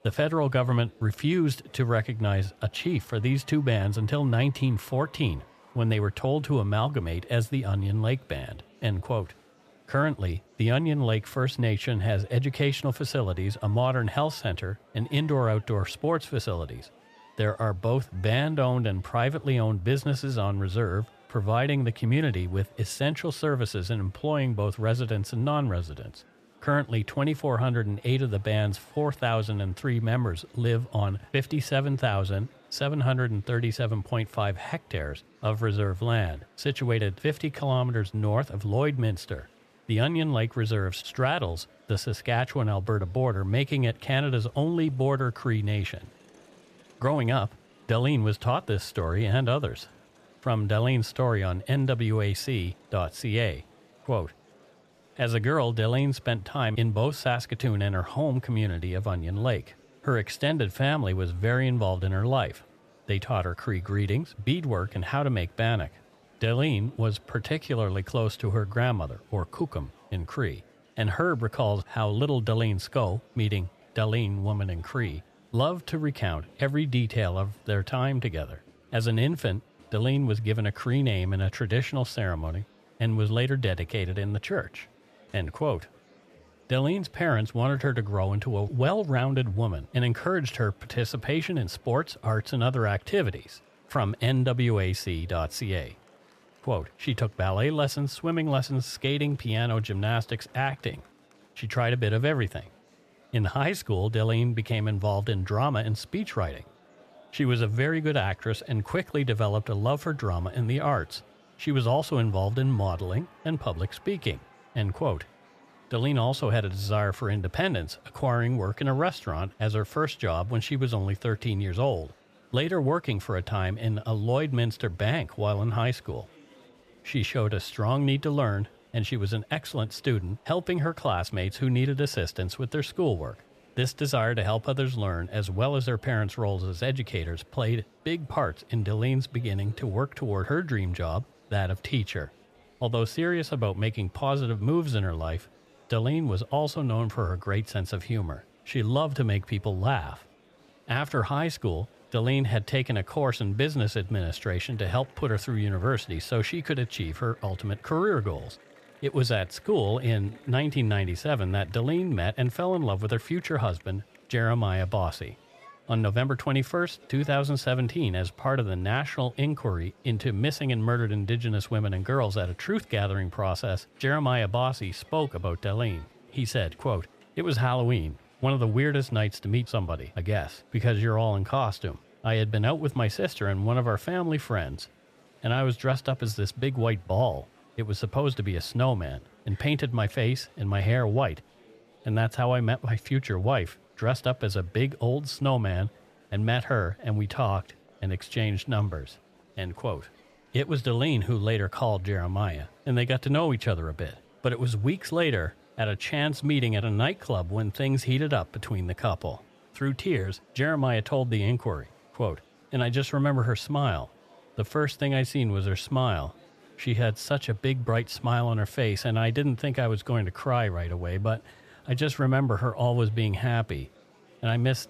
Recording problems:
murmuring crowd; faint; throughout; 30 dB below the speech

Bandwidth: 14.5 kHz